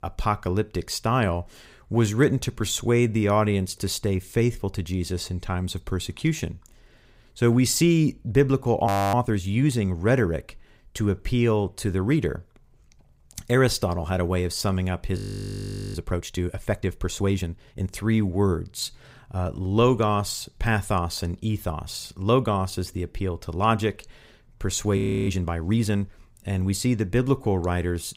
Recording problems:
audio freezing; at 9 s, at 15 s for 1 s and at 25 s

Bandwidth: 15.5 kHz